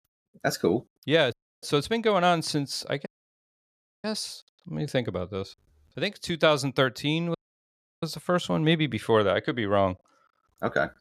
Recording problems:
audio cutting out; at 1.5 s, at 3 s for 1 s and at 7.5 s for 0.5 s

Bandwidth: 14.5 kHz